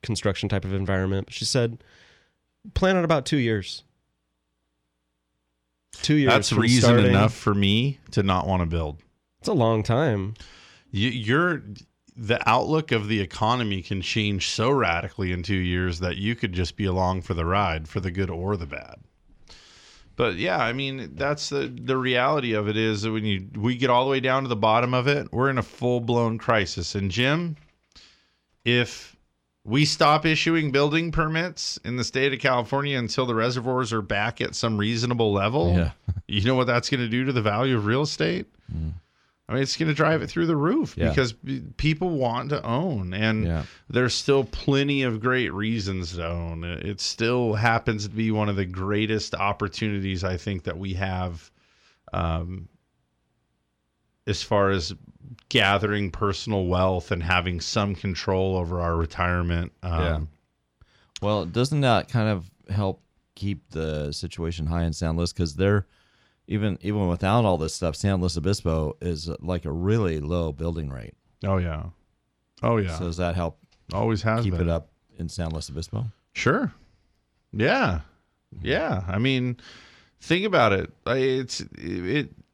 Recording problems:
none

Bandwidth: 18.5 kHz